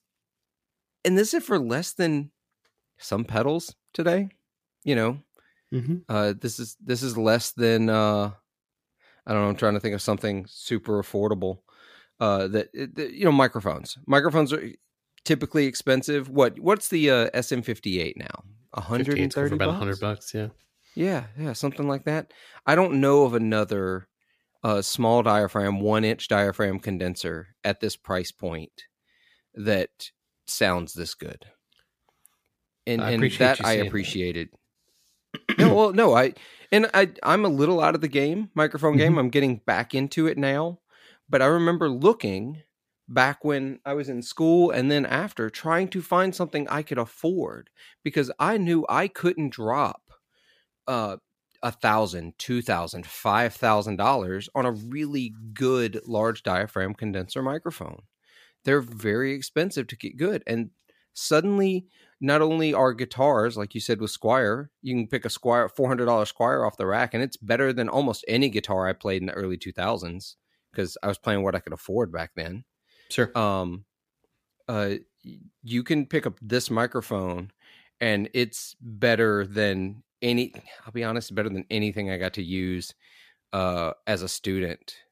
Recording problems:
none

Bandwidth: 15 kHz